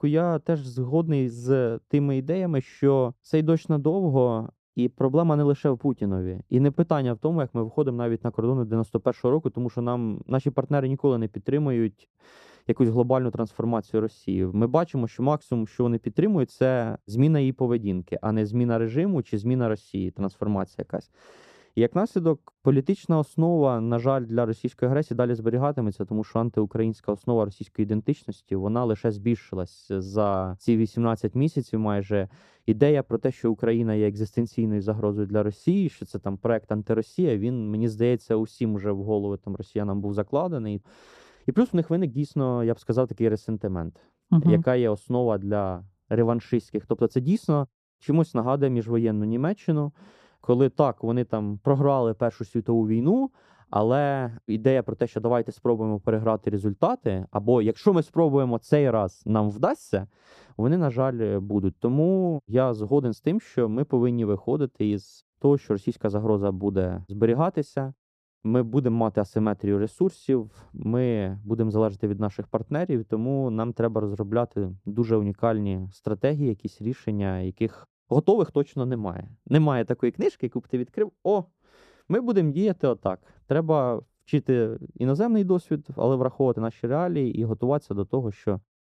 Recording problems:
muffled; slightly; fading above 1 kHz

